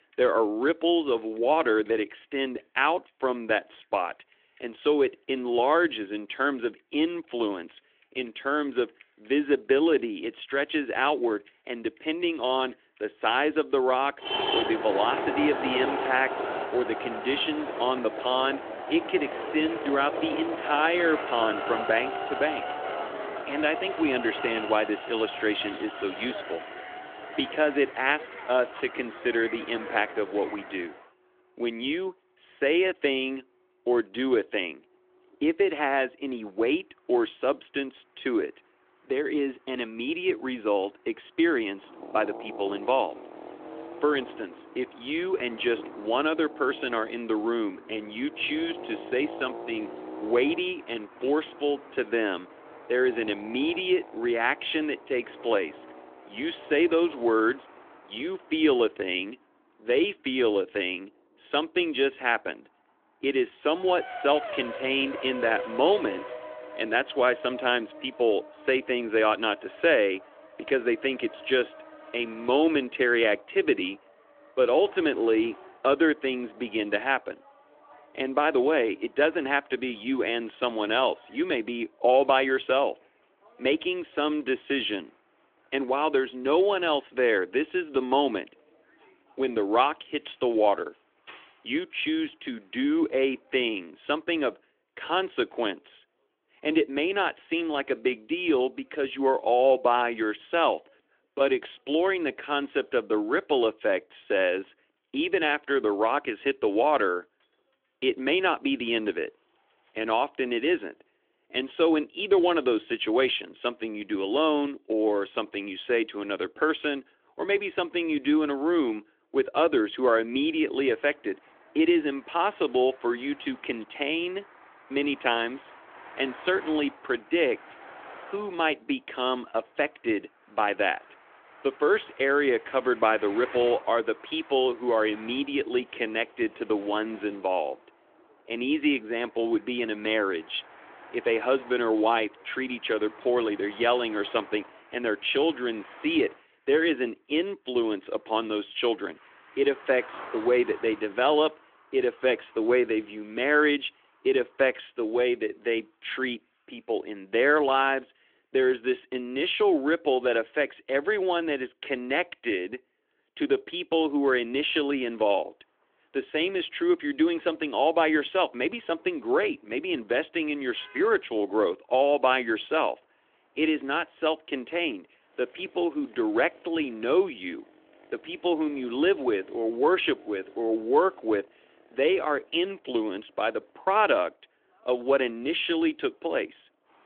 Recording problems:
phone-call audio; nothing above 3.5 kHz
traffic noise; noticeable; throughout; 10 dB below the speech

